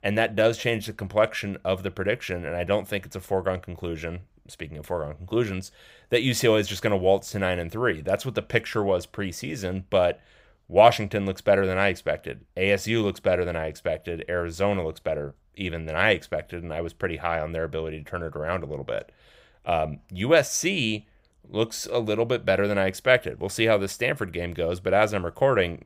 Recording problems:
none

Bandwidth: 15.5 kHz